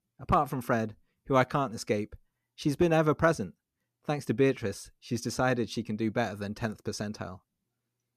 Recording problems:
none

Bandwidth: 14.5 kHz